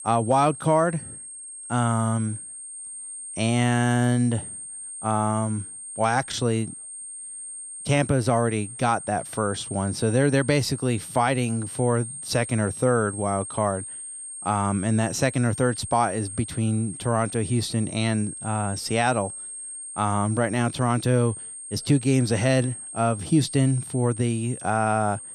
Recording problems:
high-pitched whine; noticeable; throughout; 8.5 kHz, 10 dB below the speech

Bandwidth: 13.5 kHz